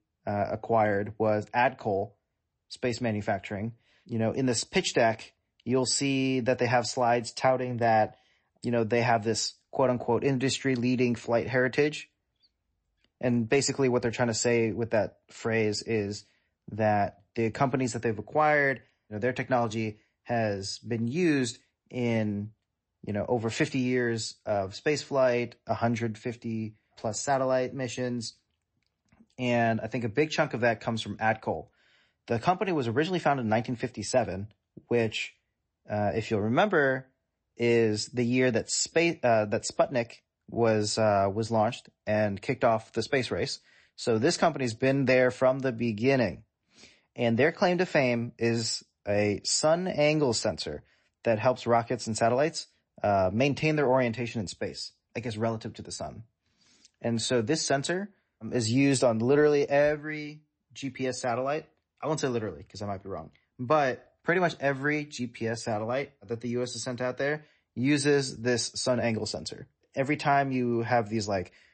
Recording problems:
garbled, watery; slightly; nothing above 8 kHz

